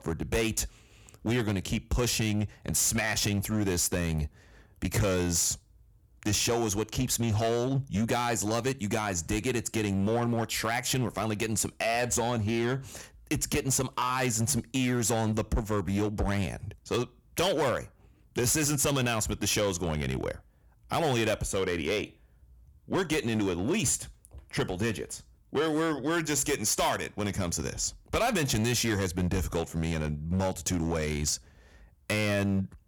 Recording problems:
distortion; slight; 9% of the sound clipped

